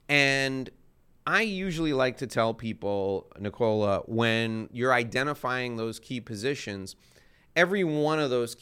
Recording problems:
none

